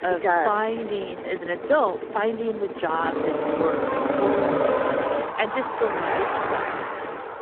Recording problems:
phone-call audio; poor line
traffic noise; loud; throughout; as loud as the speech

